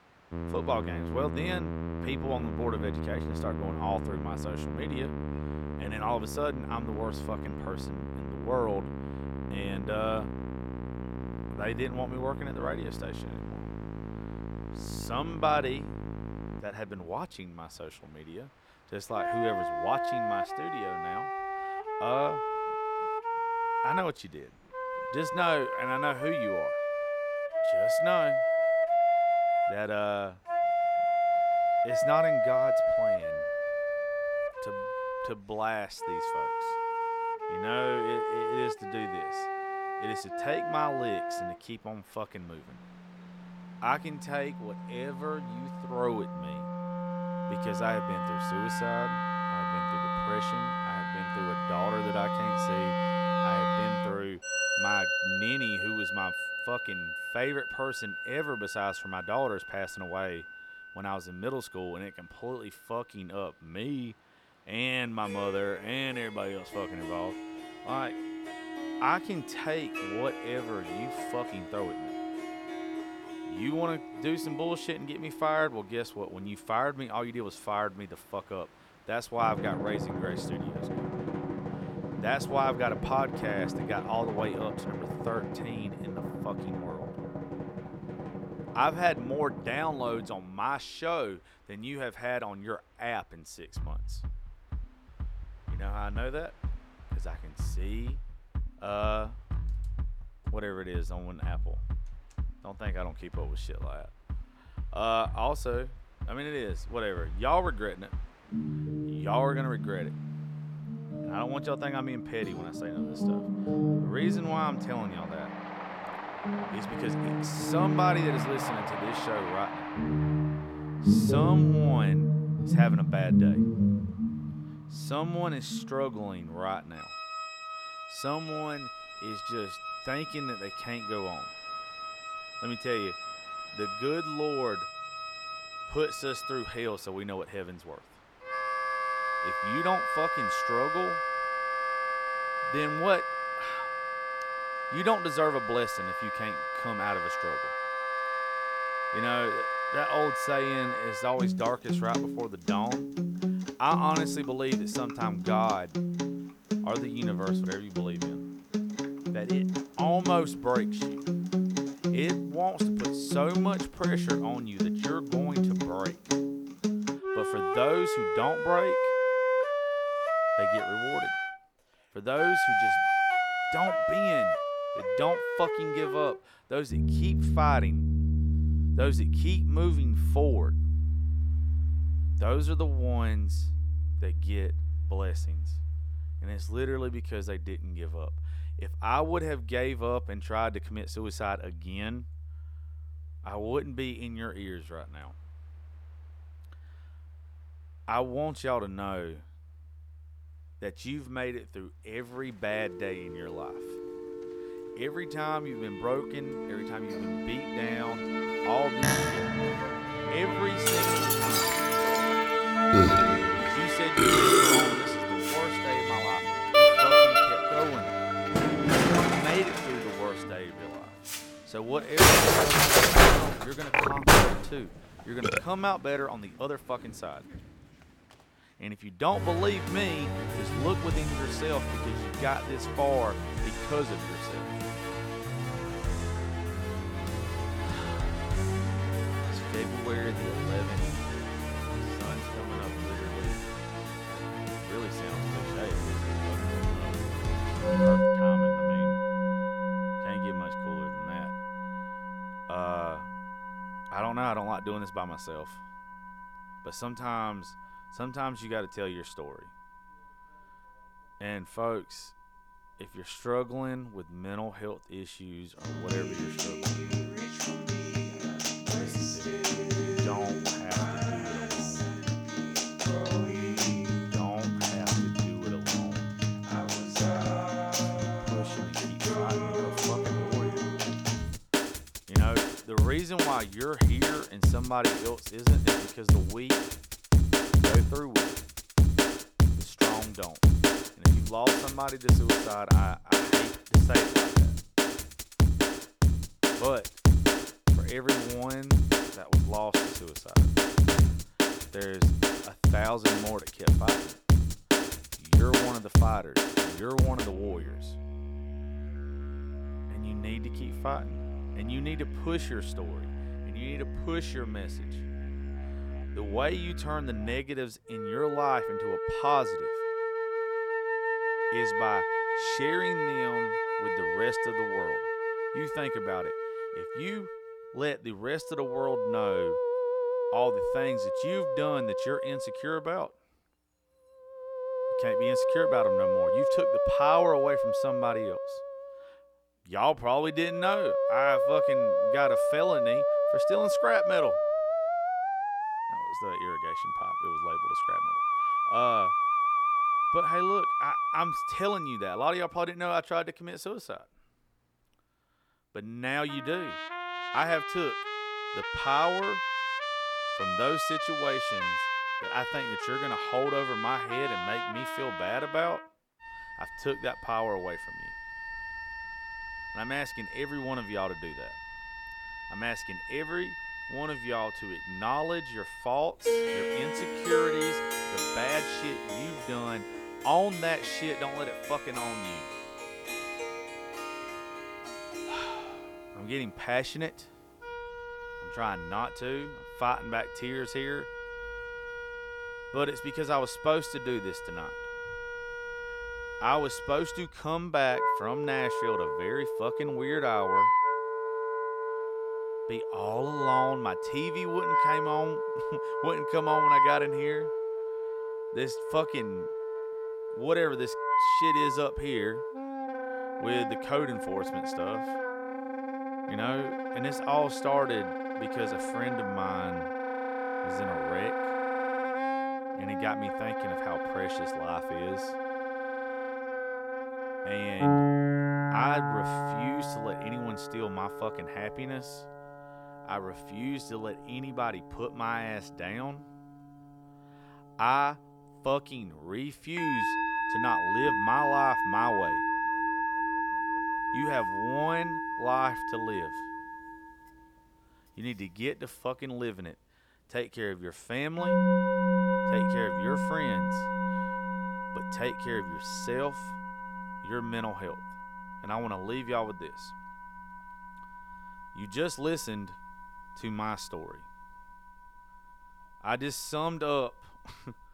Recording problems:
background music; very loud; throughout; 4 dB above the speech
train or aircraft noise; noticeable; throughout; 20 dB below the speech

